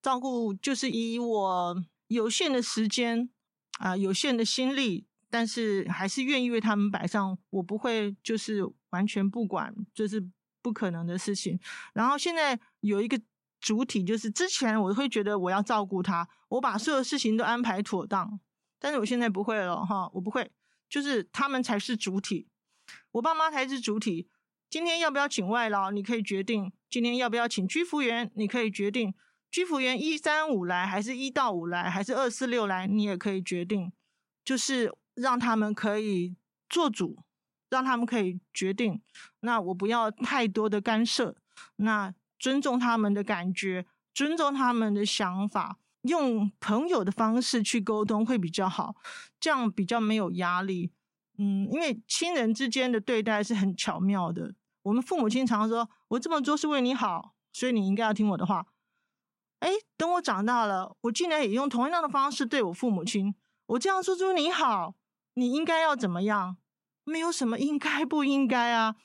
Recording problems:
none

